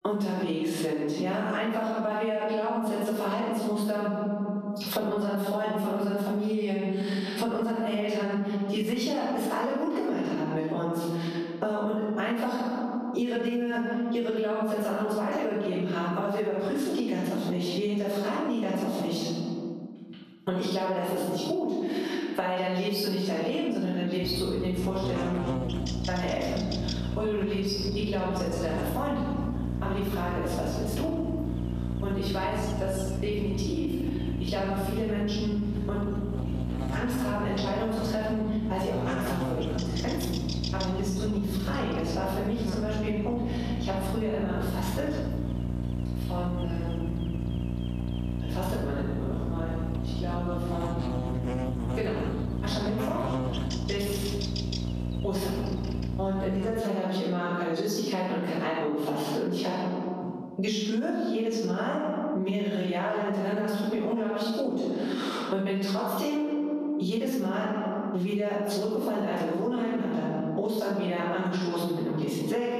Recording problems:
room echo; strong; dies away in 1.2 s
off-mic speech; far
squashed, flat; somewhat
electrical hum; loud; from 24 to 57 s; 60 Hz, 8 dB below the speech

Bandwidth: 14 kHz